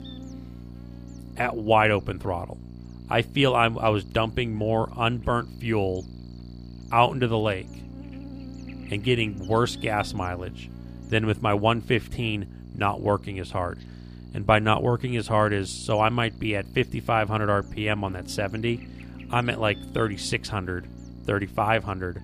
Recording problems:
electrical hum; faint; throughout; 60 Hz, 25 dB below the speech

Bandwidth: 15 kHz